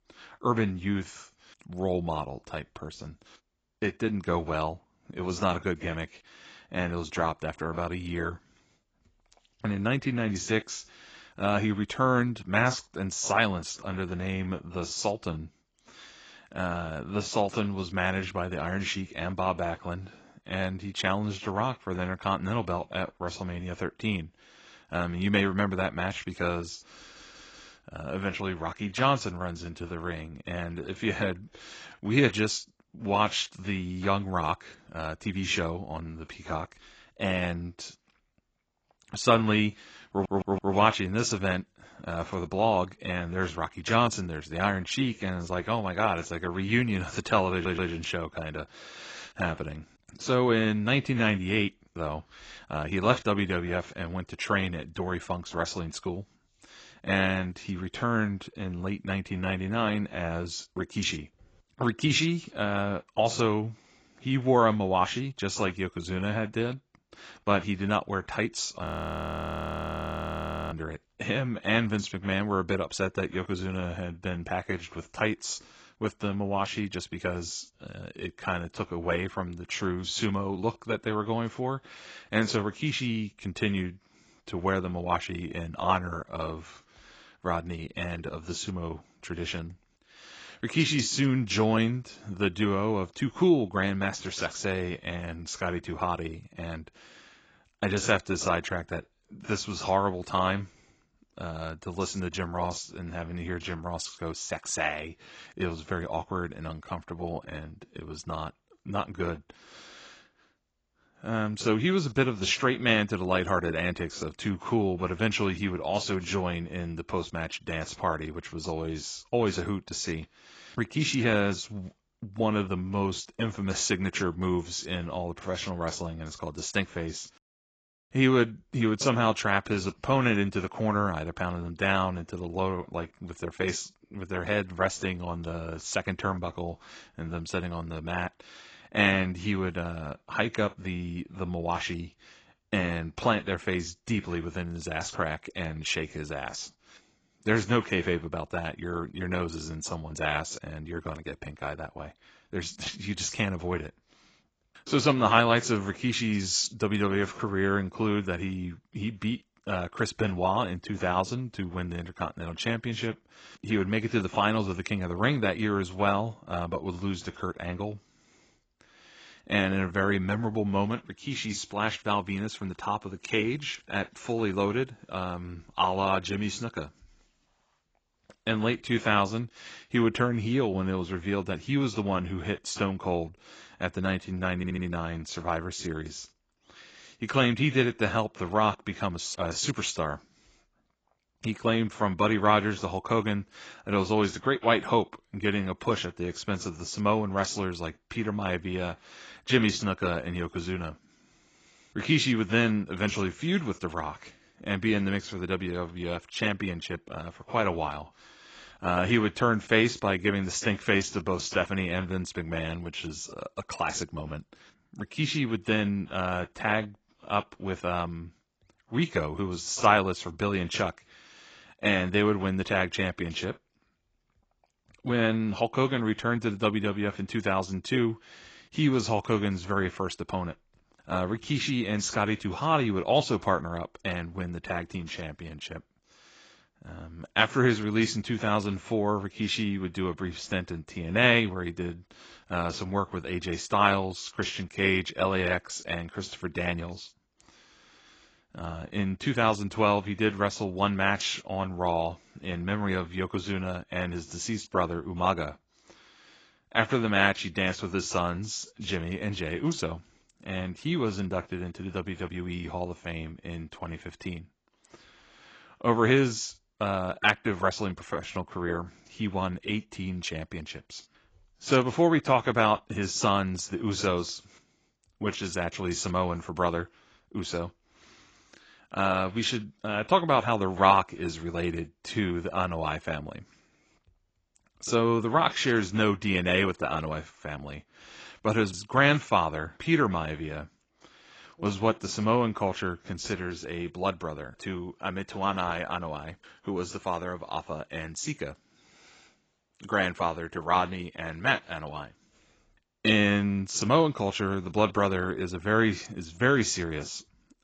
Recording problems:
garbled, watery; badly; nothing above 7.5 kHz
audio stuttering; 4 times, first at 27 s
audio freezing; at 1:09 for 2 s

